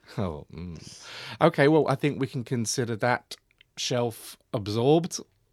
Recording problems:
none

